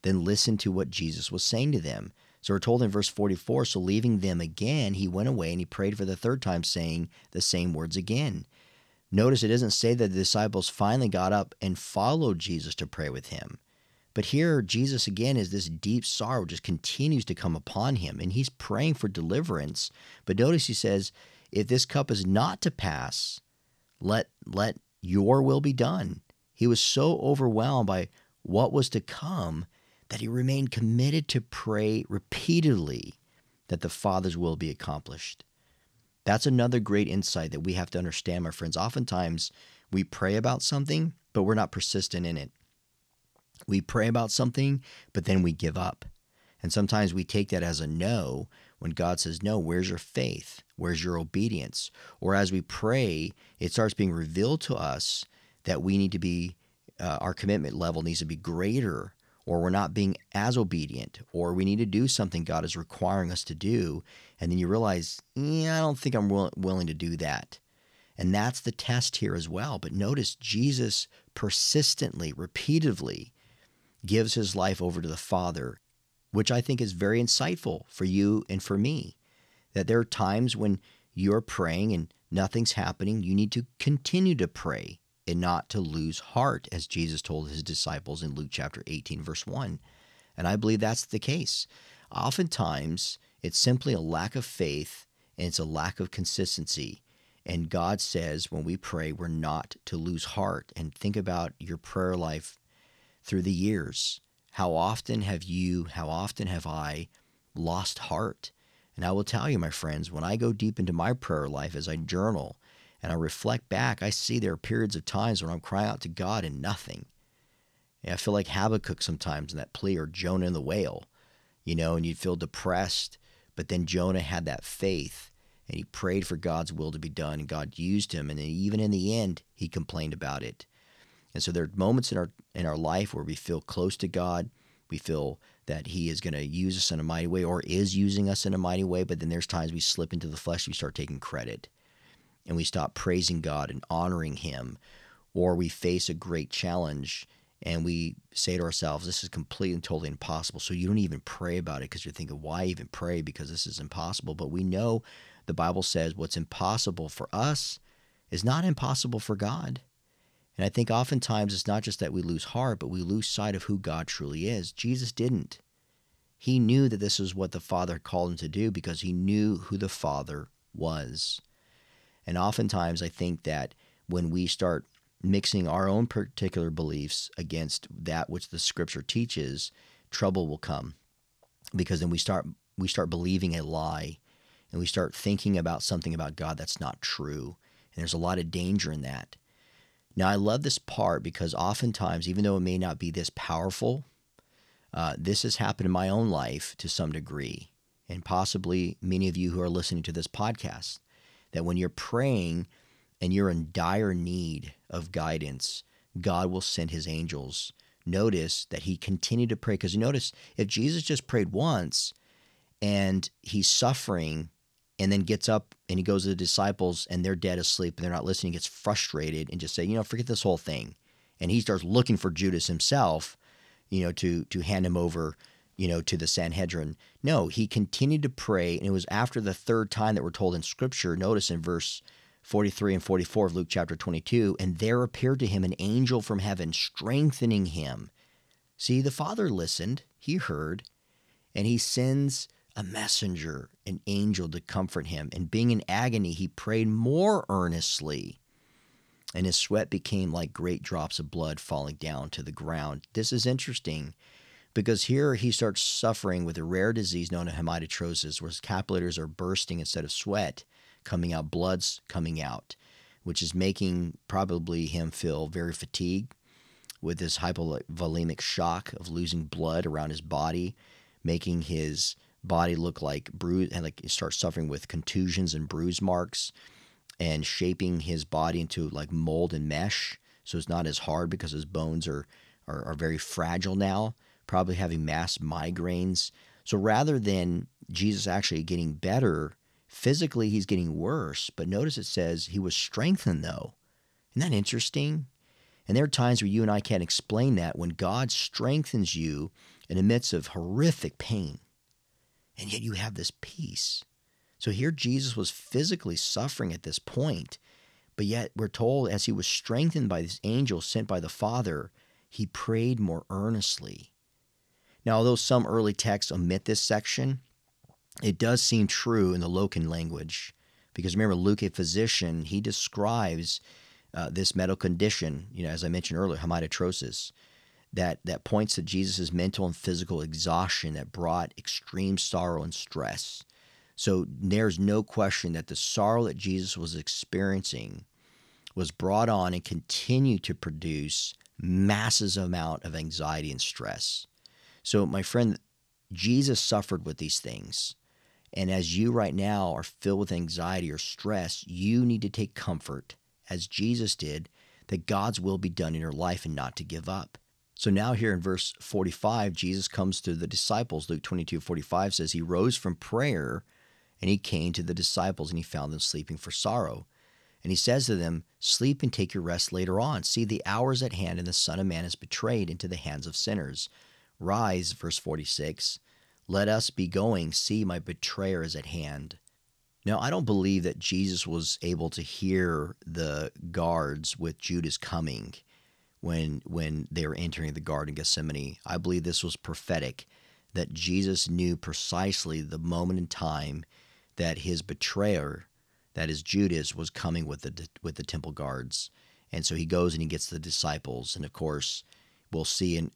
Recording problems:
none

